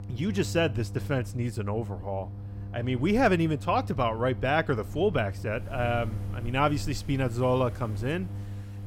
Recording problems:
wind in the background; noticeable; throughout; 20 dB below the speech
electrical hum; faint; throughout; 50 Hz, 20 dB below the speech

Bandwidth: 16 kHz